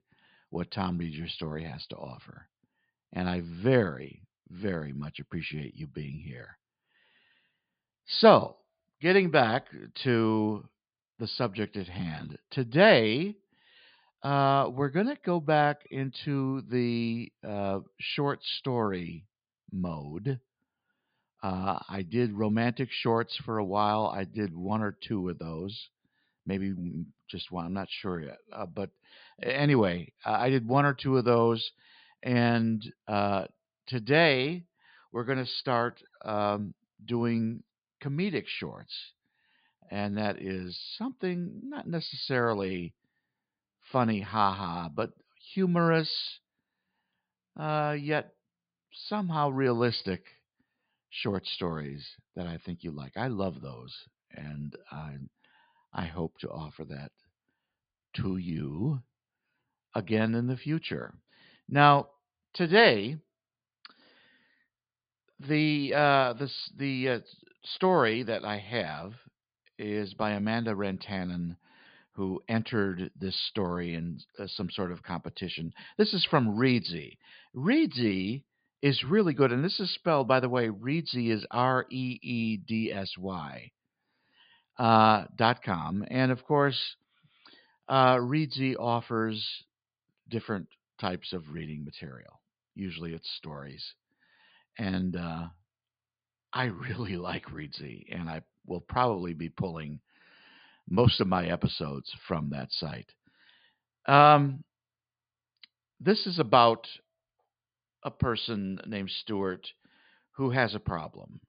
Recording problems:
high frequencies cut off; severe; nothing above 5 kHz

